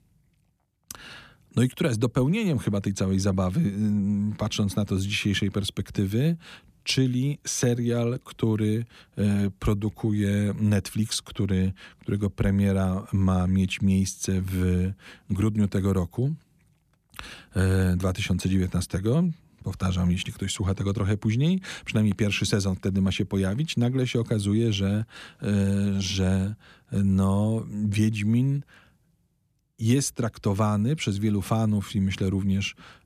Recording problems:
none

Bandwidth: 14.5 kHz